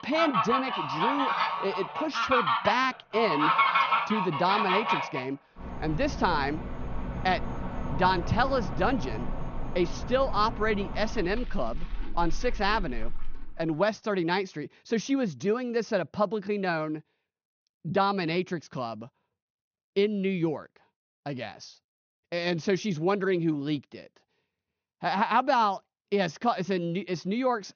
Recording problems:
high frequencies cut off; noticeable; nothing above 6.5 kHz
animal sounds; loud; until 13 s; 2 dB below the speech

